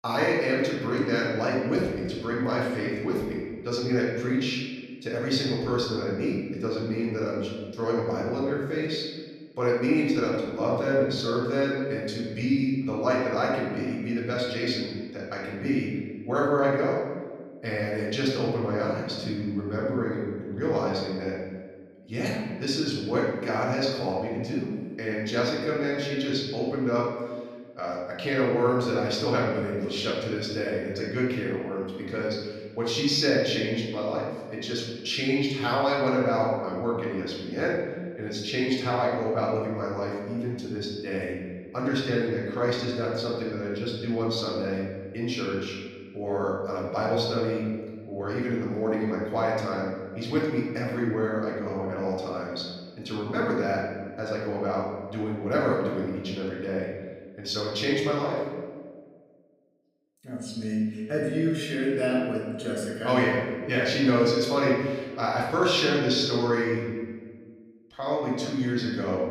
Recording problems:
off-mic speech; far
room echo; noticeable; dies away in 1.4 s

